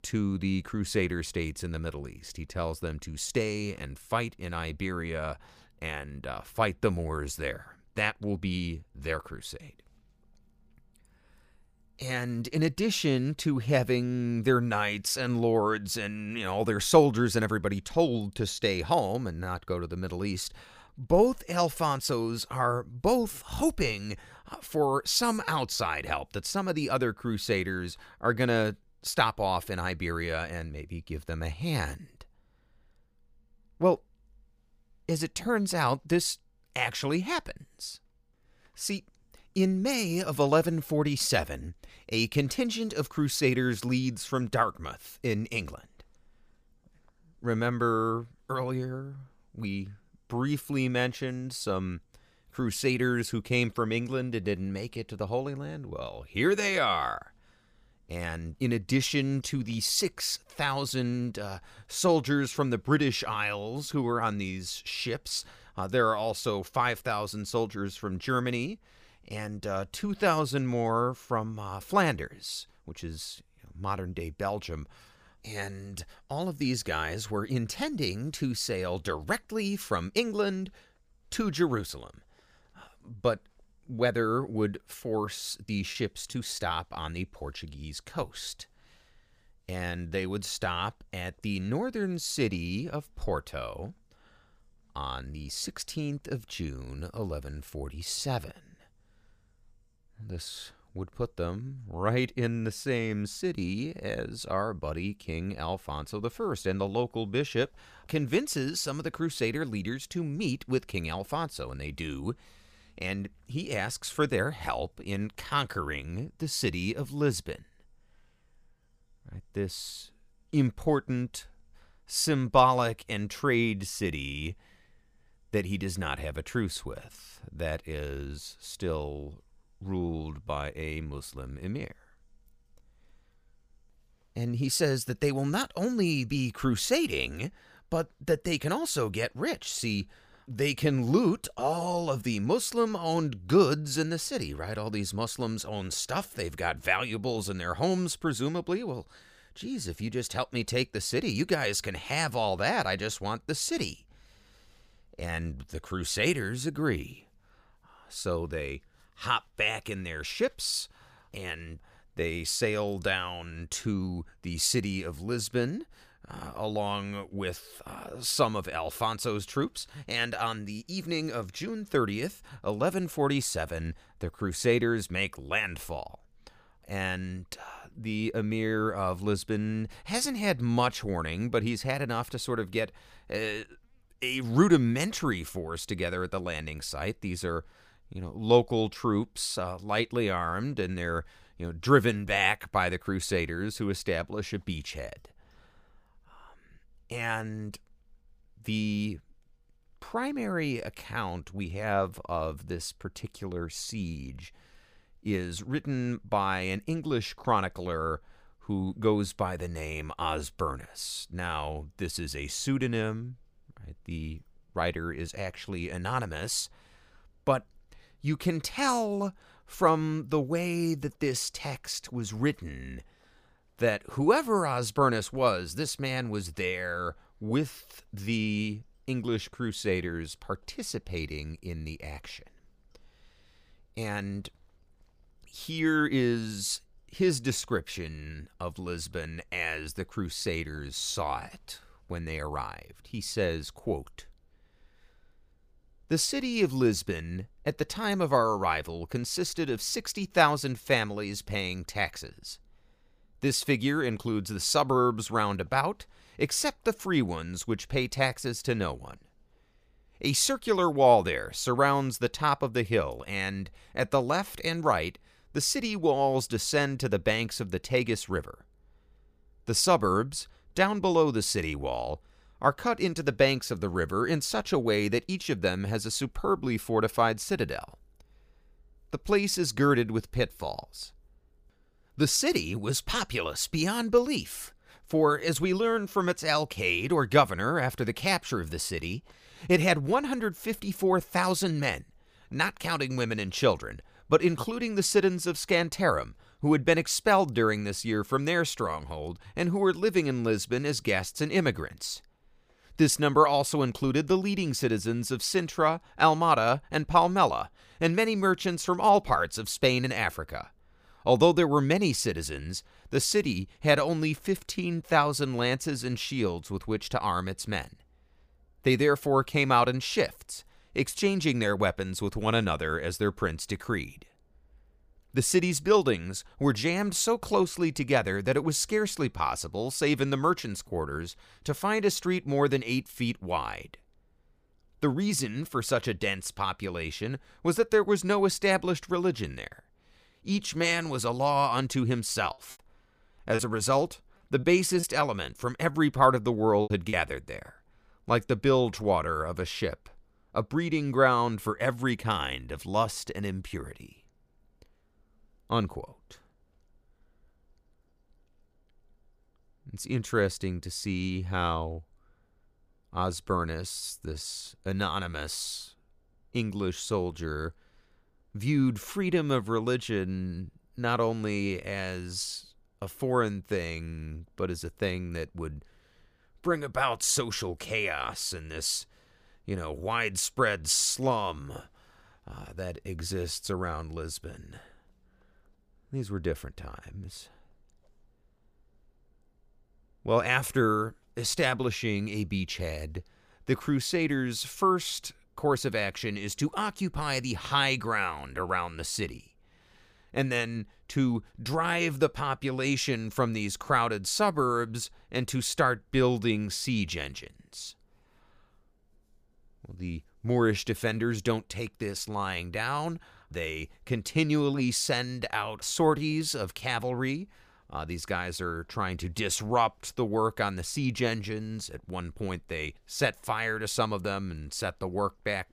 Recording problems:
choppy; very; from 1:25 to 1:27 and from 5:43 to 5:47; 9% of the speech affected

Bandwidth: 15 kHz